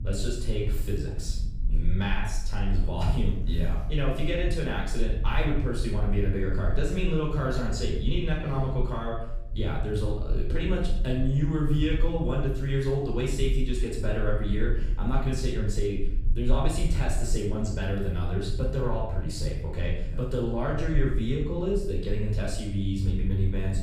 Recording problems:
off-mic speech; far
room echo; noticeable; dies away in 0.6 s
low rumble; noticeable; throughout; 20 dB below the speech

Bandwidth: 15 kHz